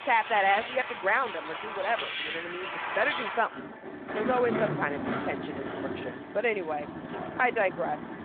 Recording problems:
phone-call audio
traffic noise; loud; throughout; 5 dB below the speech

